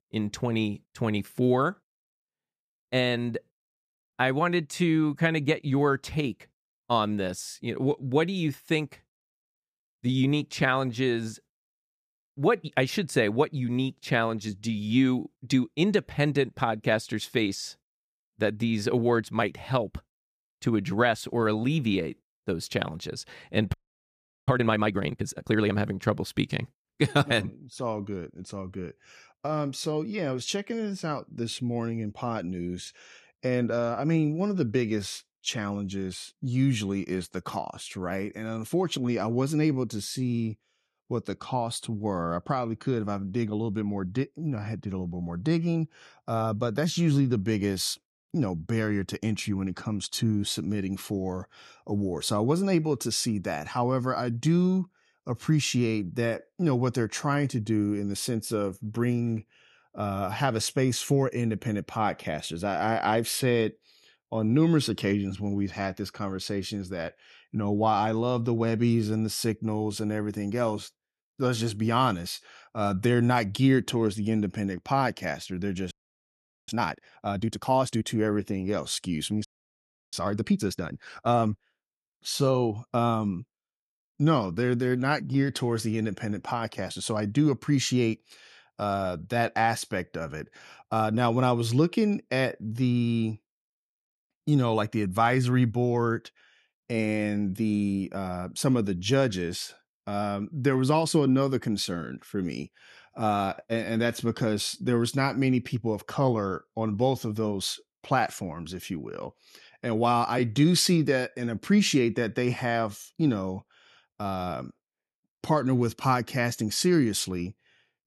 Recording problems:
audio freezing; at 24 s for 0.5 s, at 1:16 for 1 s and at 1:19 for 0.5 s

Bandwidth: 15 kHz